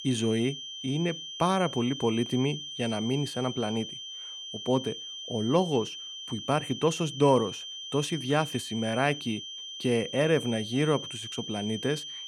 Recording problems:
high-pitched whine; loud; throughout; 3 kHz, 8 dB below the speech

